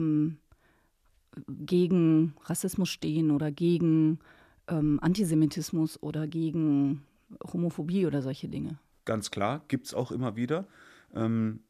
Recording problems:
abrupt cut into speech; at the start

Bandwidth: 14.5 kHz